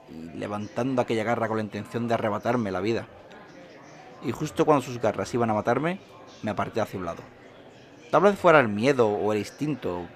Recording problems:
murmuring crowd; faint; throughout; 20 dB below the speech

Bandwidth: 14.5 kHz